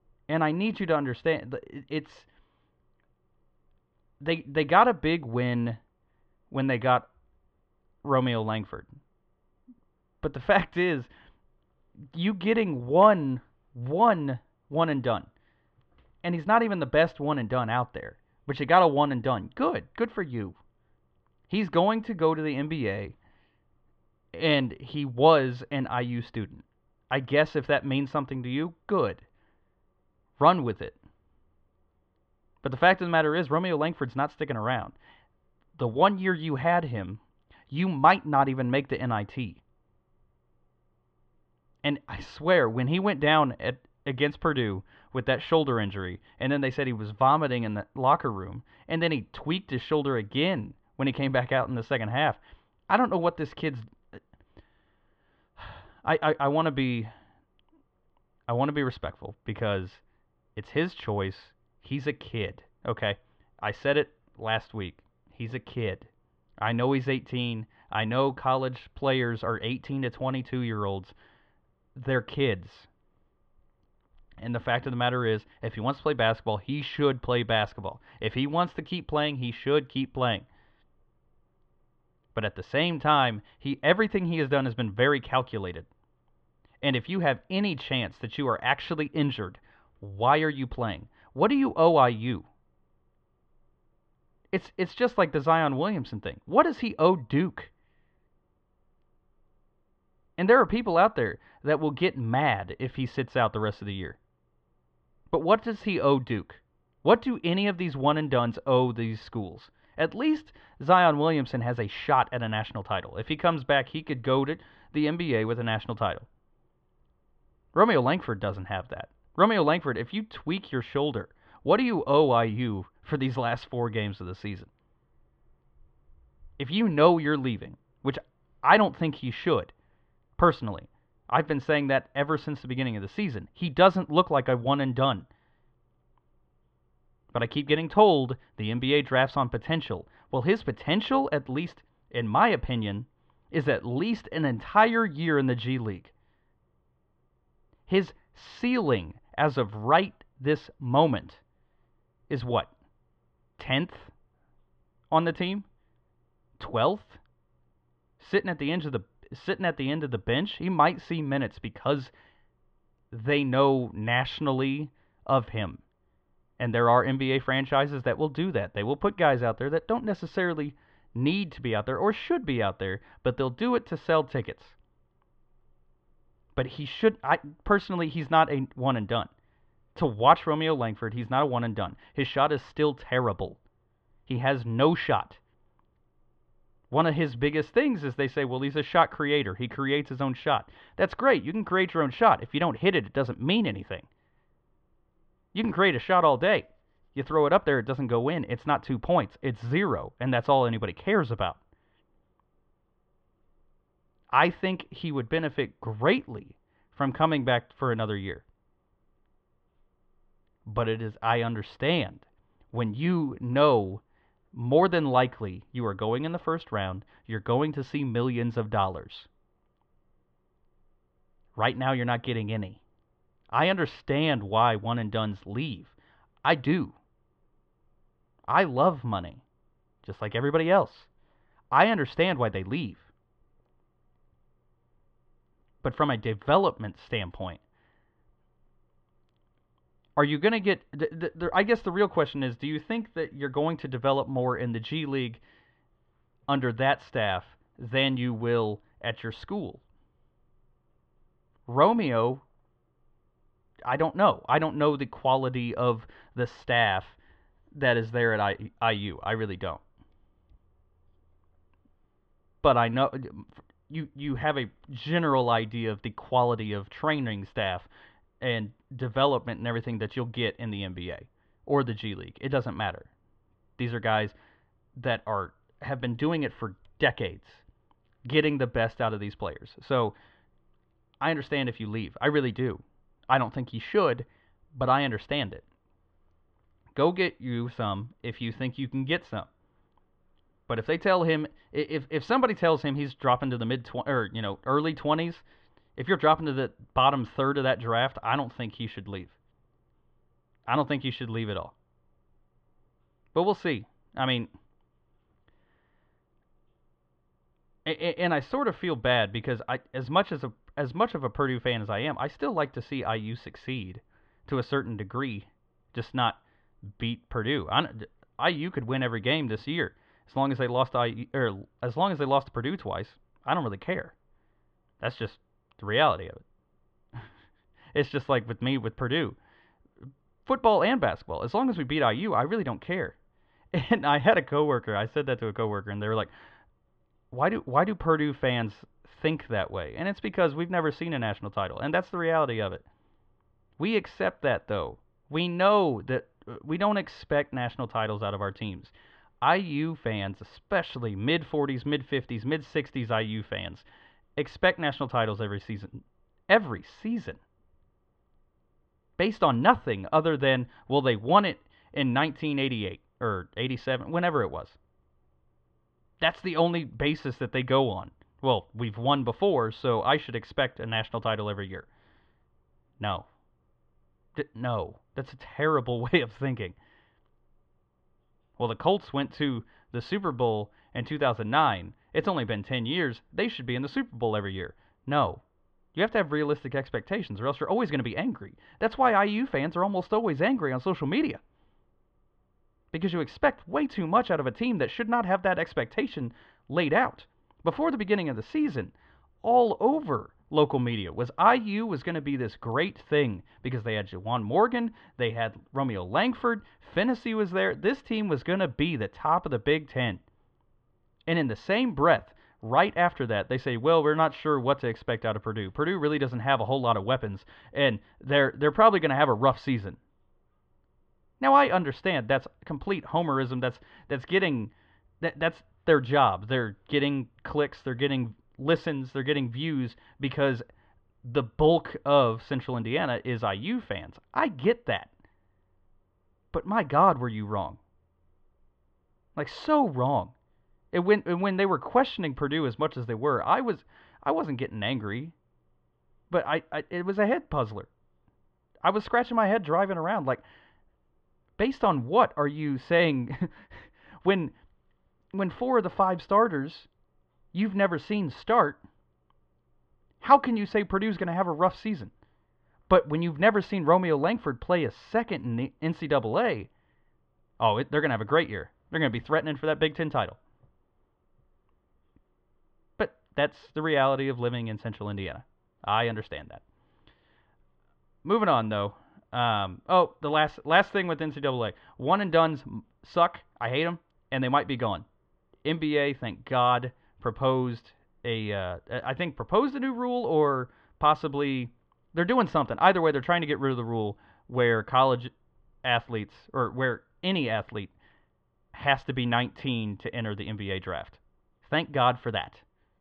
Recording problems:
muffled; very; fading above 3 kHz

